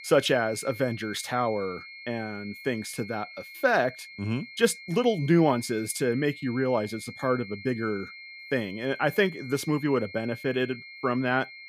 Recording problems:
high-pitched whine; noticeable; throughout; 2 kHz, 15 dB below the speech

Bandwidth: 15 kHz